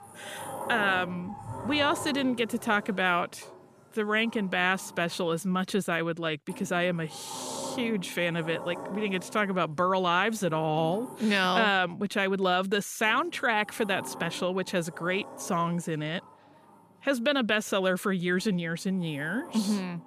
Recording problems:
household noises; noticeable; throughout; 15 dB below the speech

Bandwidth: 14.5 kHz